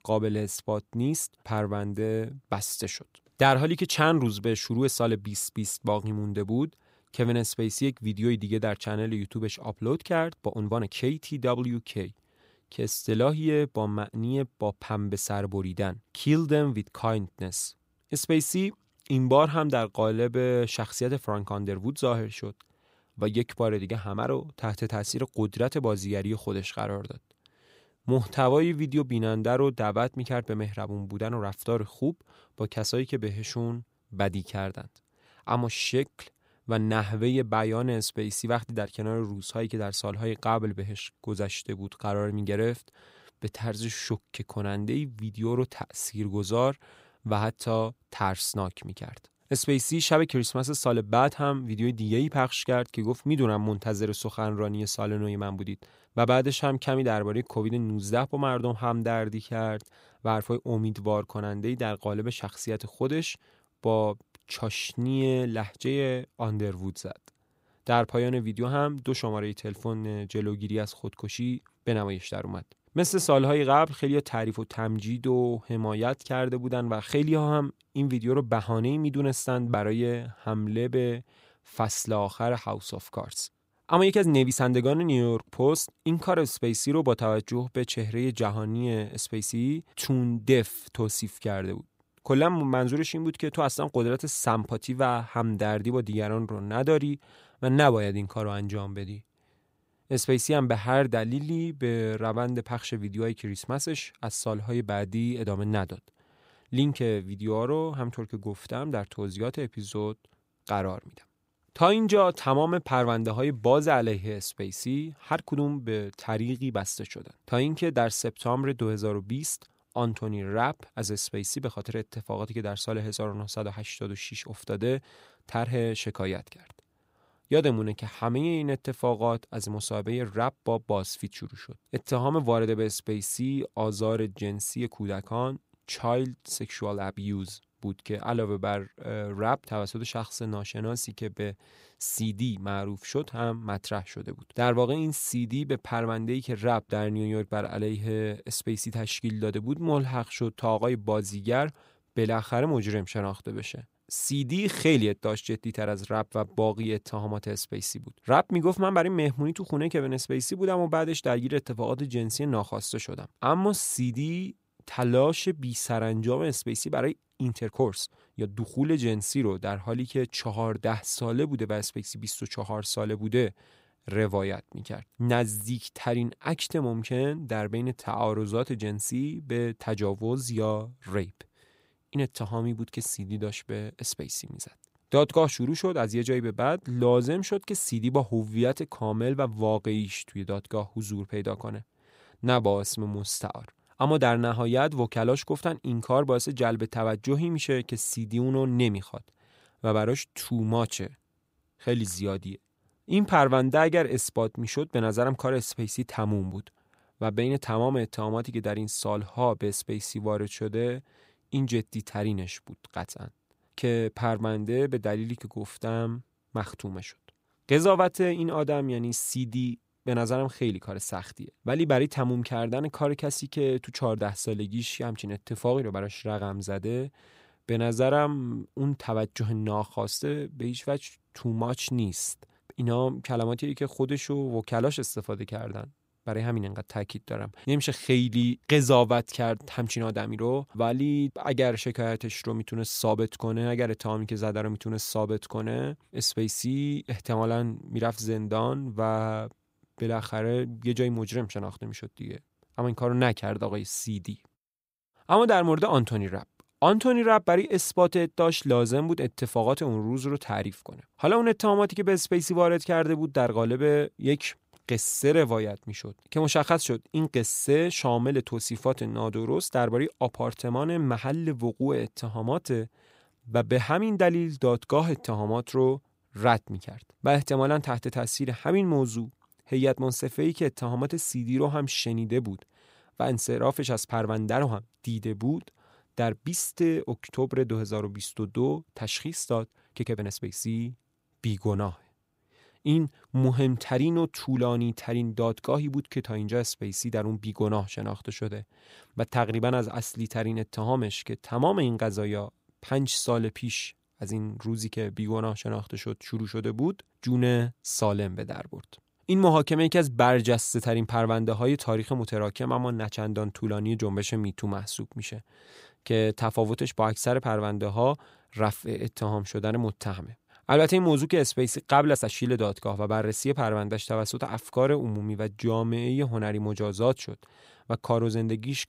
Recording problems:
uneven, jittery; strongly; from 10 s to 5:22

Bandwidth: 15.5 kHz